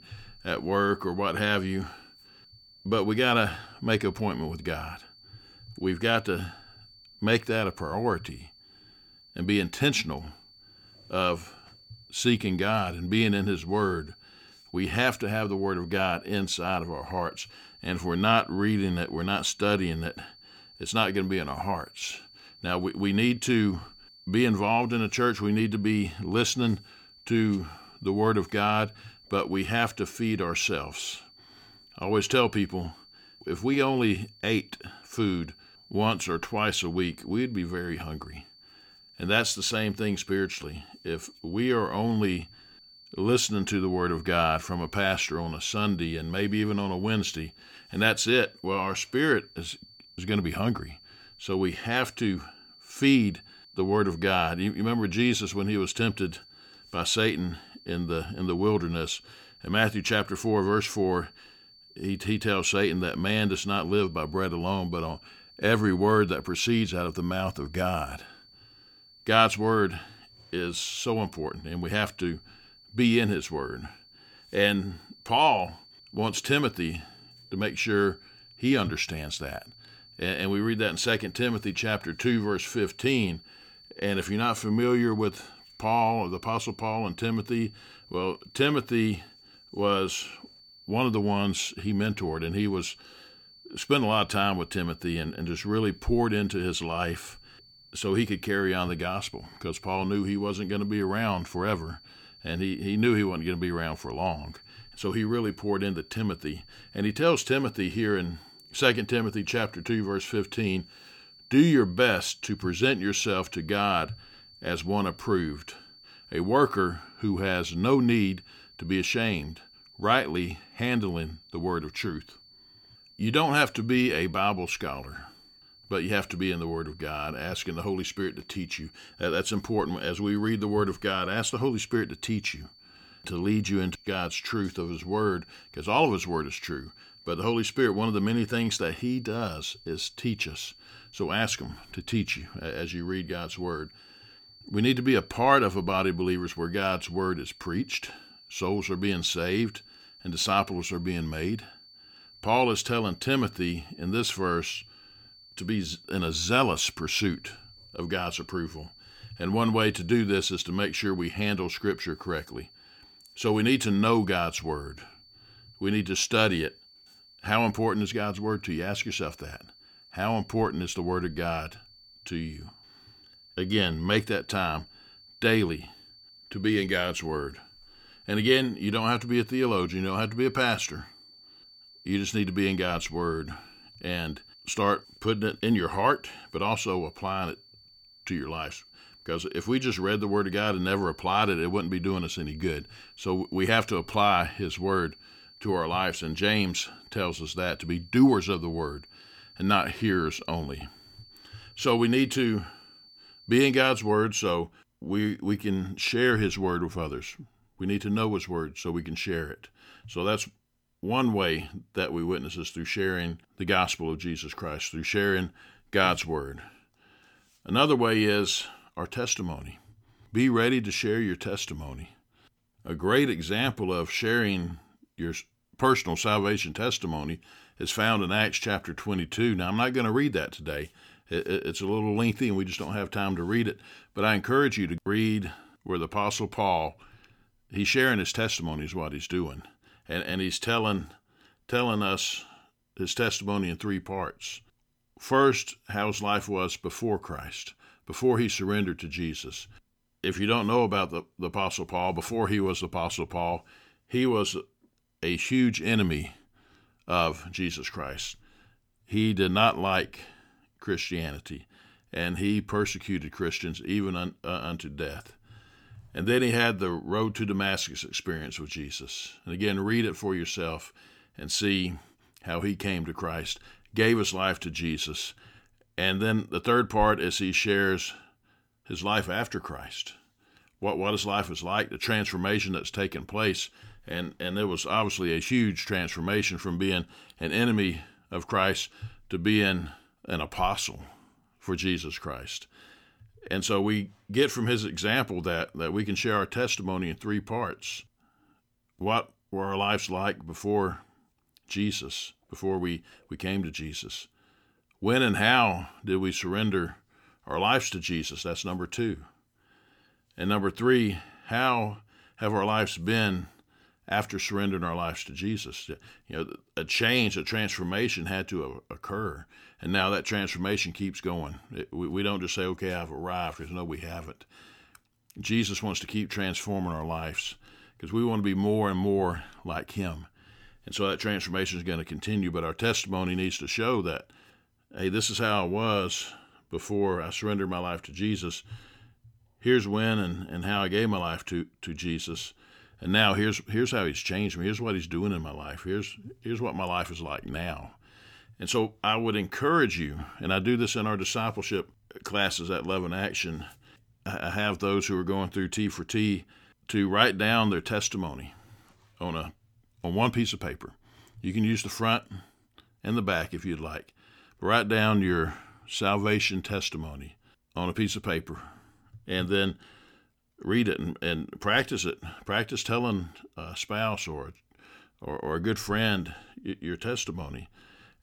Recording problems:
high-pitched whine; faint; until 3:24; 4.5 kHz, 25 dB below the speech

